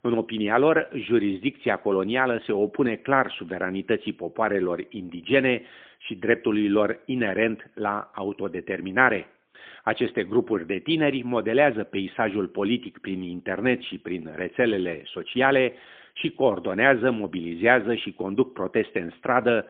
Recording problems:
phone-call audio; poor line; nothing above 3.5 kHz

